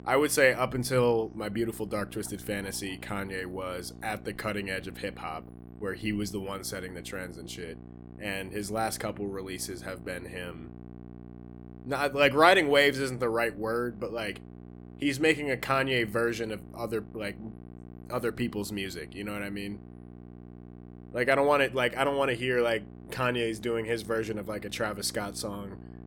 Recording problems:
electrical hum; faint; throughout; 60 Hz, 25 dB below the speech

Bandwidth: 17 kHz